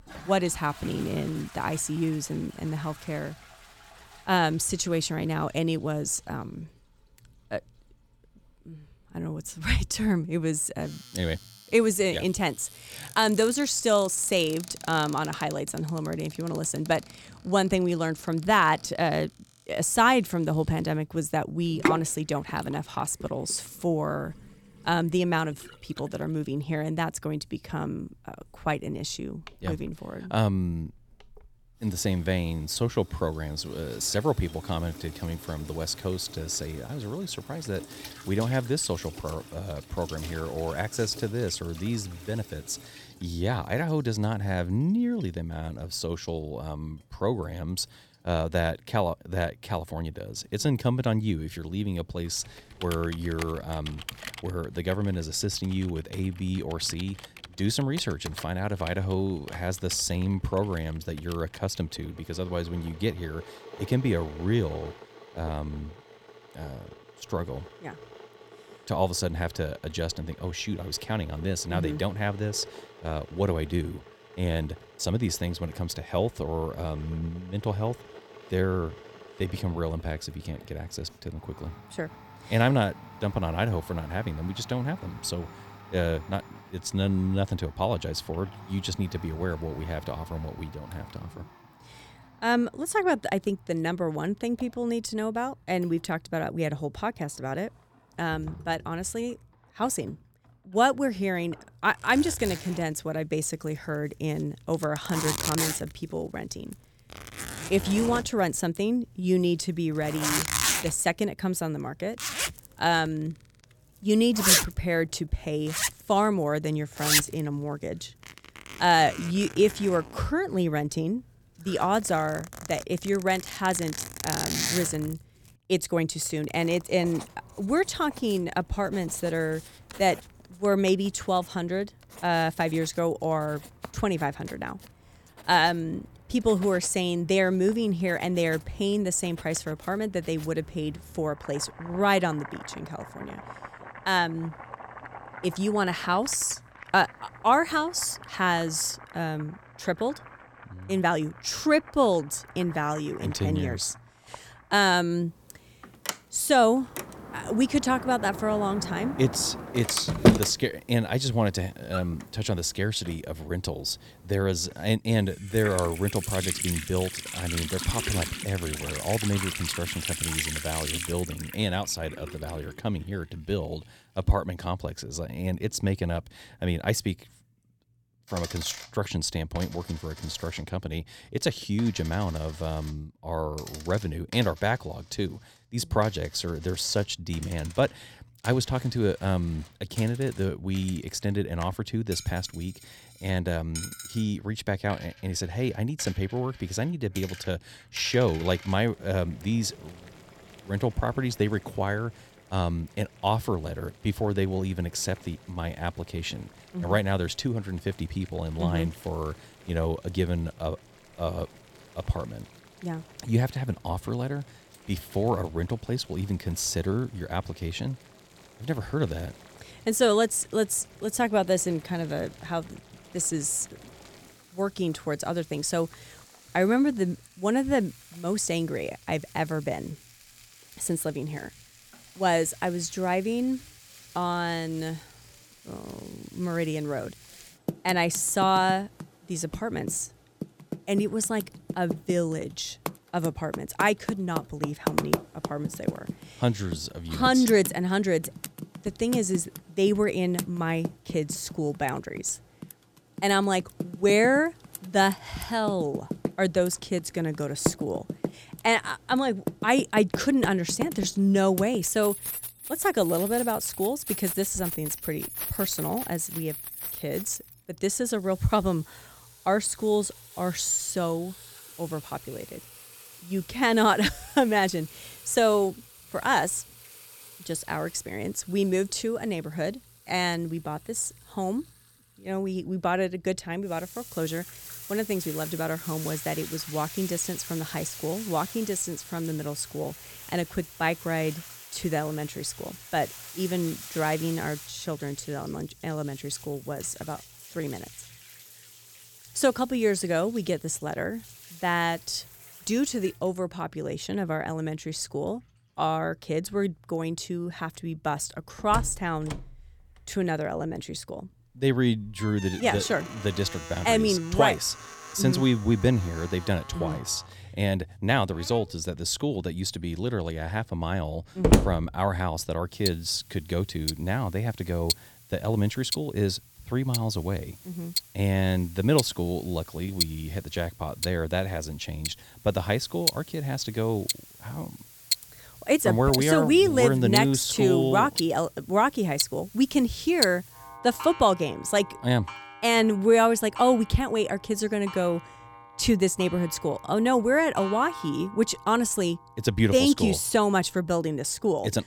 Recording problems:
household noises; loud; throughout; 8 dB below the speech

